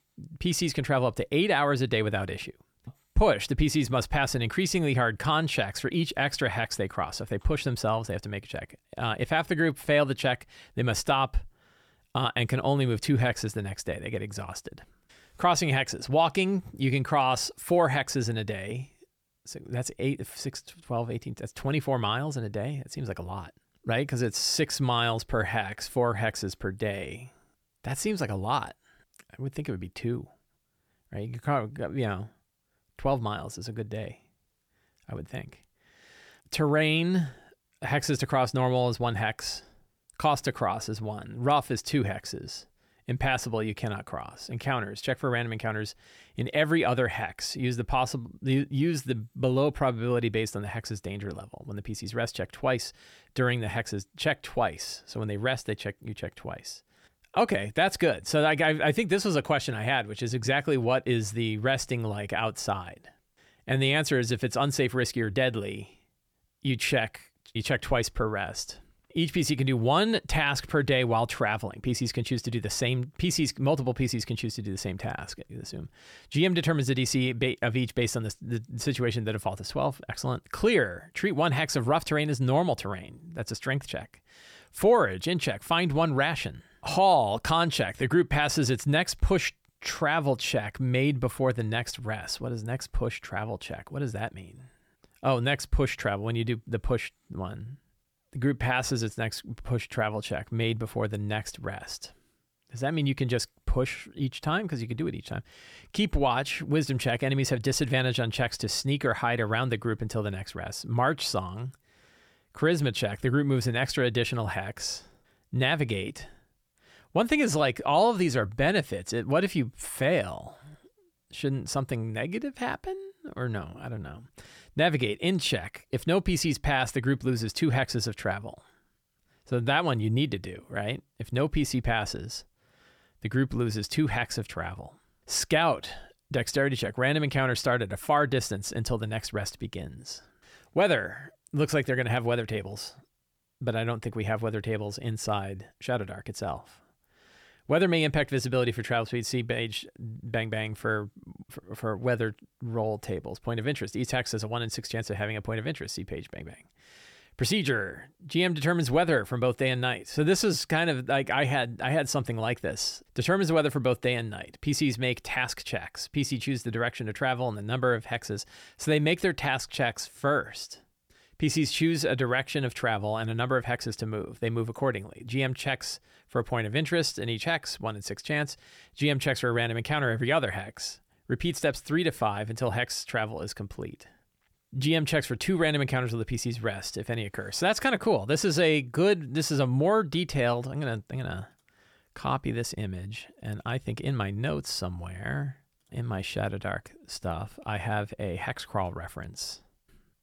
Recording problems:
none

